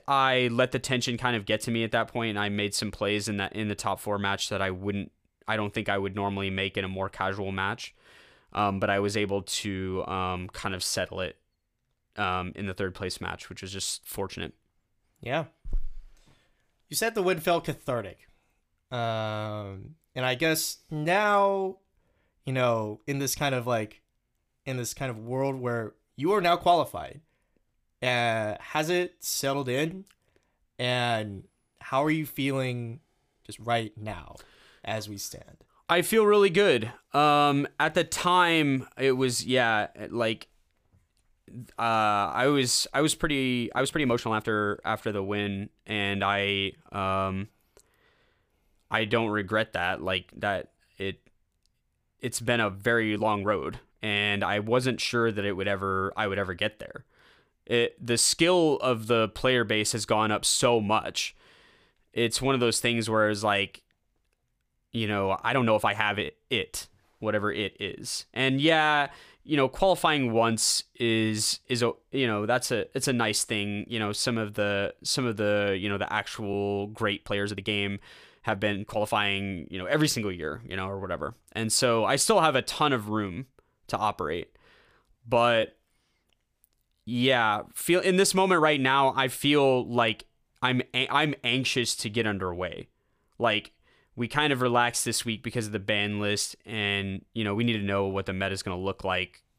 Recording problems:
uneven, jittery; strongly; from 9.5 s to 1:37

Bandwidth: 15 kHz